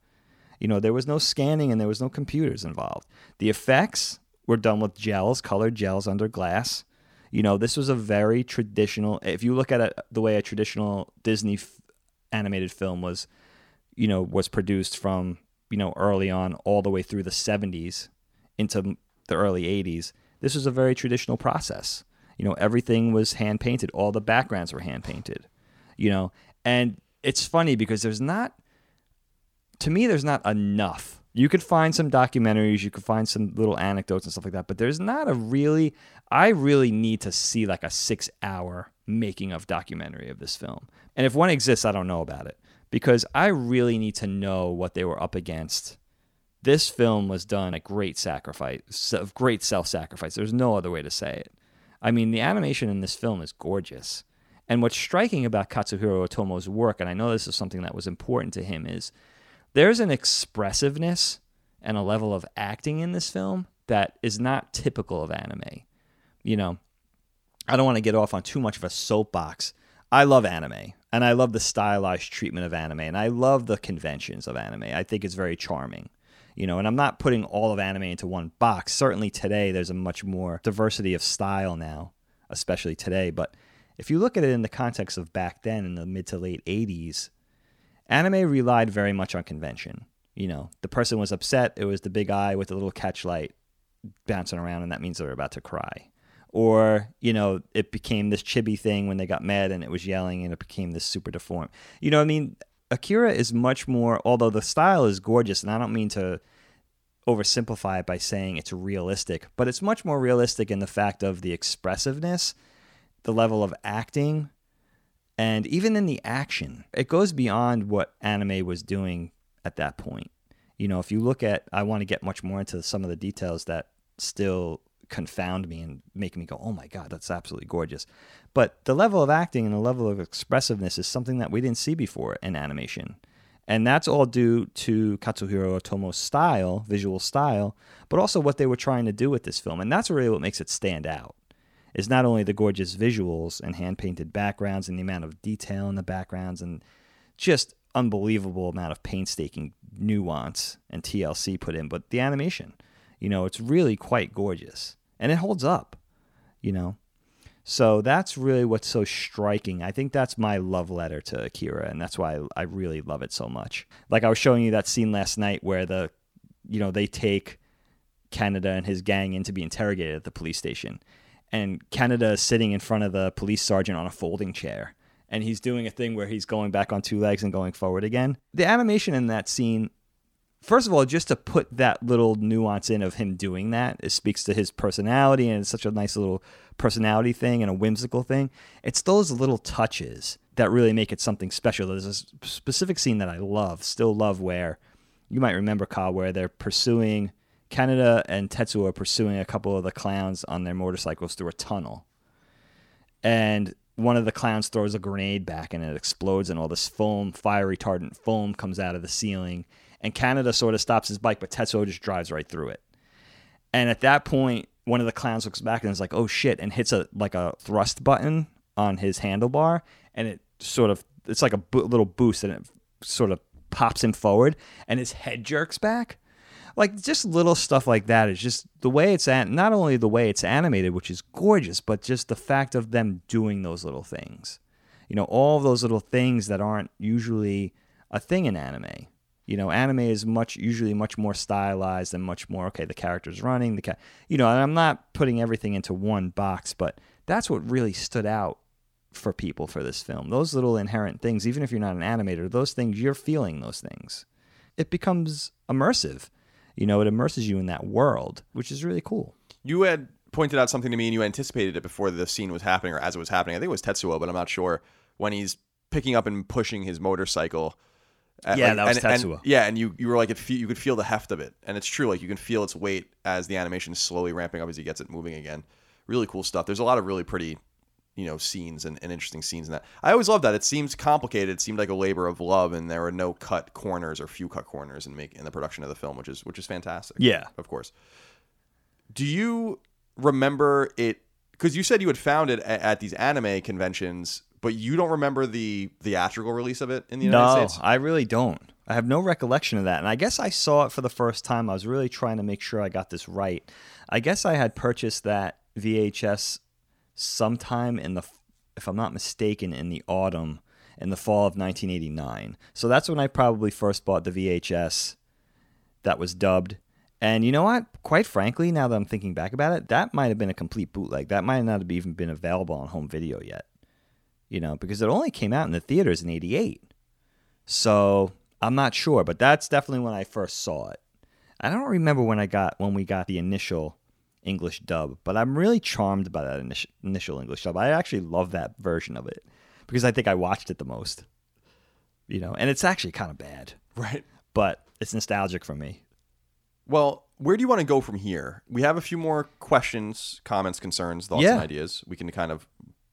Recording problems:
none

